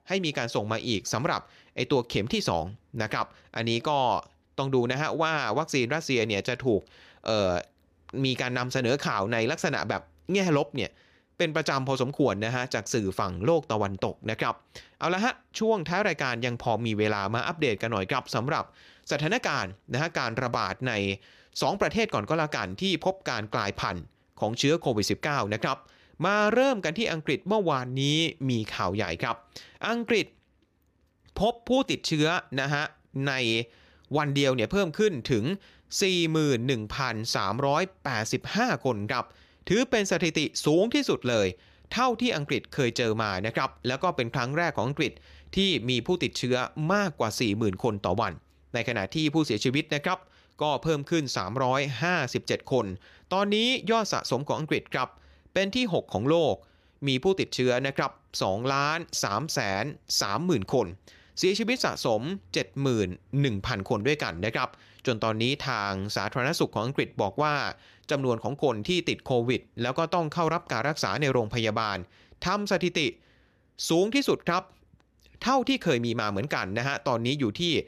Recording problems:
none

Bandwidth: 14.5 kHz